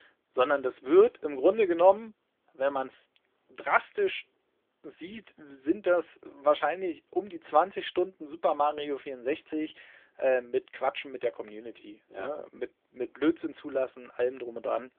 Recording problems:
phone-call audio; nothing above 3.5 kHz

